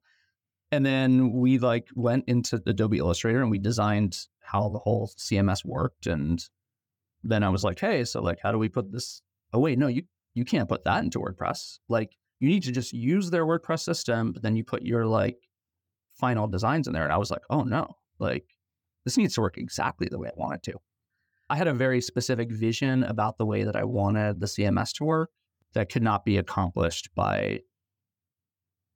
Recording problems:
uneven, jittery; slightly; from 4.5 to 22 s

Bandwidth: 17.5 kHz